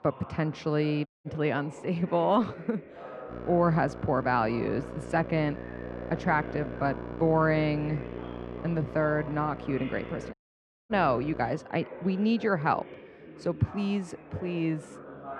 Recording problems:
muffled; slightly; fading above 3 kHz
electrical hum; noticeable; from 3.5 to 12 s; 60 Hz, 15 dB below the speech
chatter from many people; noticeable; throughout; 15 dB below the speech
audio cutting out; at 1 s and at 10 s for 0.5 s

